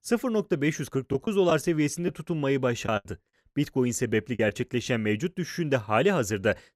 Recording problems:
choppy; very; from 1 to 4.5 s; 7% of the speech affected

